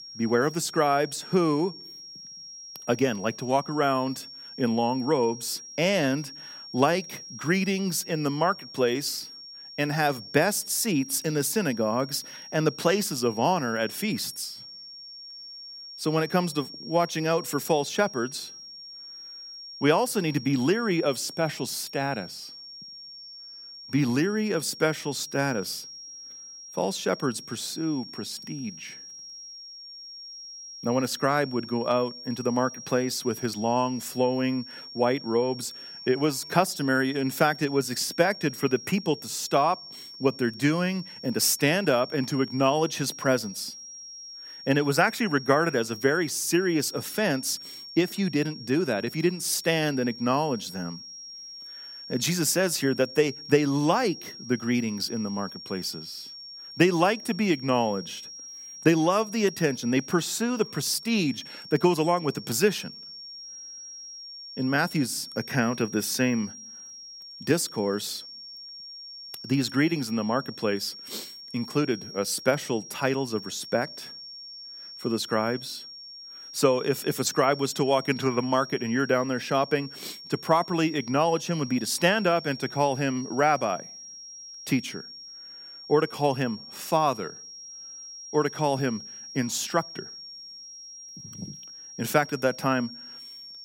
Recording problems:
high-pitched whine; noticeable; throughout; 5.5 kHz, 15 dB below the speech

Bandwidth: 16 kHz